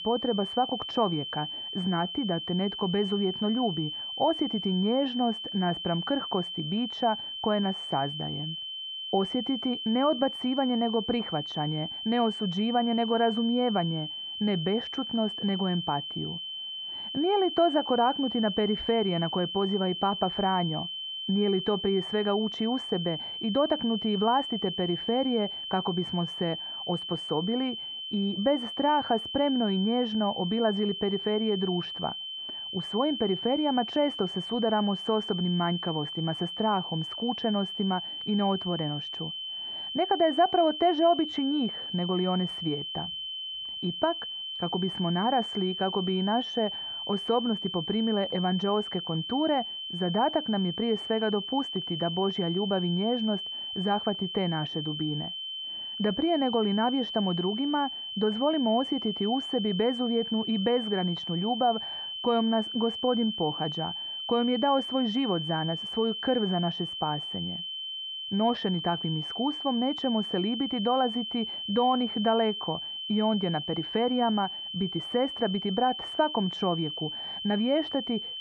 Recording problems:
muffled; very; fading above 3.5 kHz
high-pitched whine; loud; throughout; 3 kHz, 5 dB below the speech

